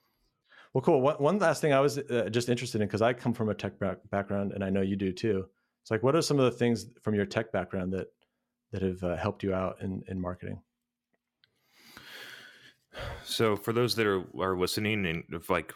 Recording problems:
none

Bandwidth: 17 kHz